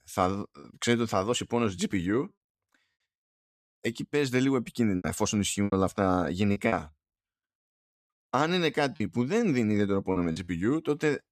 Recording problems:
choppy; very; 5% of the speech affected

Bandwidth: 14.5 kHz